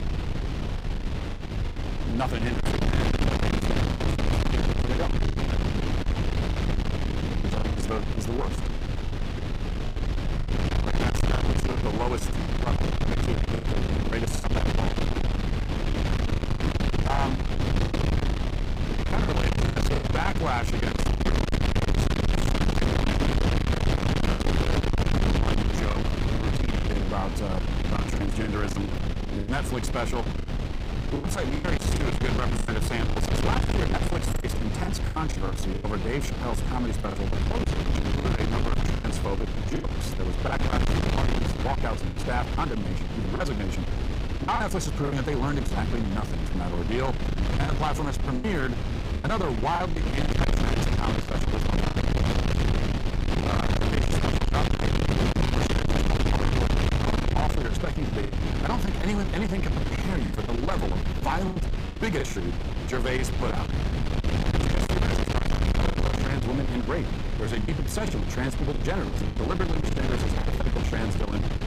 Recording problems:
distortion; heavy; 8 dB below the speech
wind noise on the microphone; heavy; 2 dB below the speech
choppy; very; 8% of the speech affected

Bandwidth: 15.5 kHz